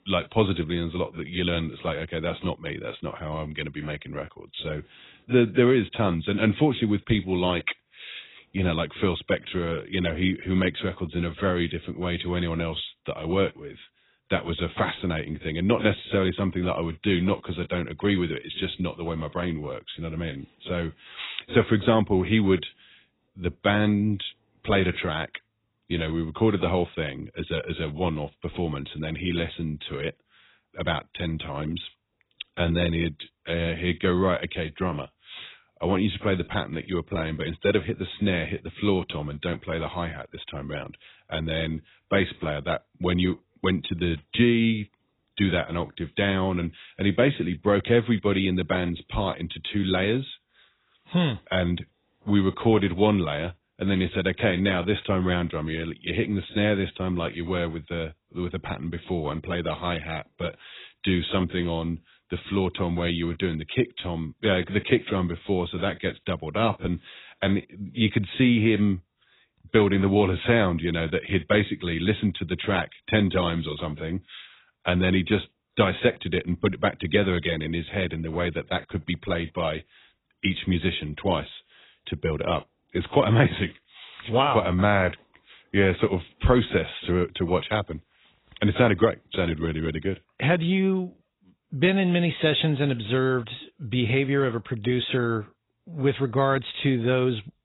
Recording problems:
garbled, watery; badly; nothing above 4 kHz

